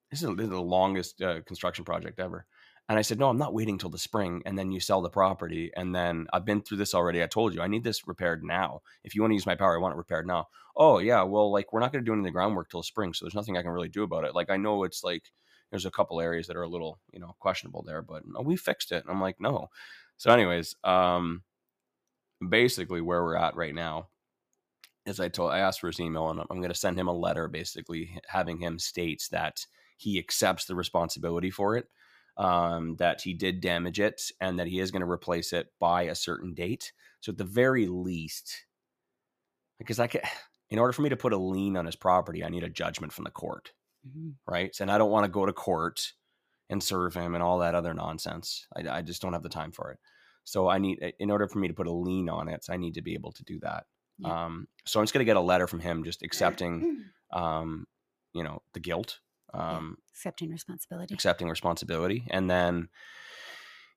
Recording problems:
none

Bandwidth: 15 kHz